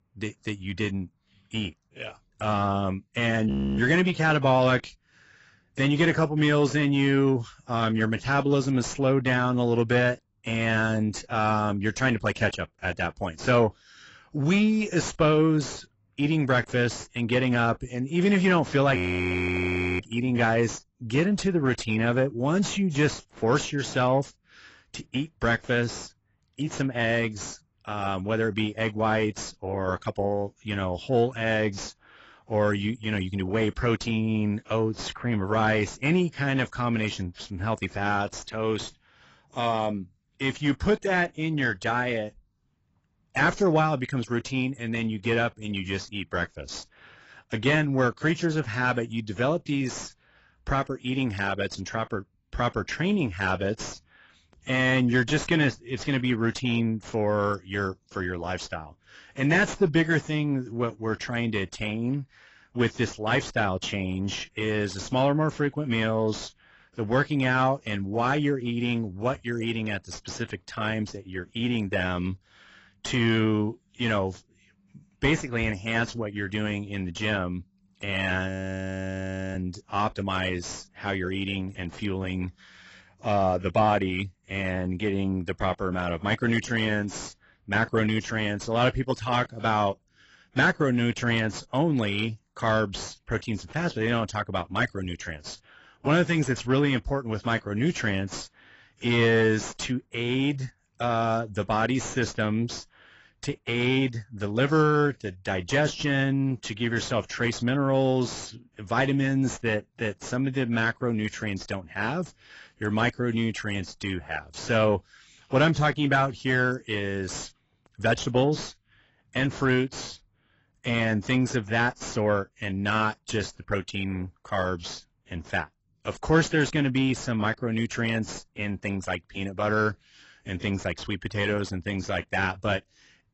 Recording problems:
garbled, watery; badly; nothing above 7.5 kHz
distortion; slight; 10 dB below the speech
audio freezing; at 3.5 s, at 19 s for 1 s and at 1:18 for 1 s

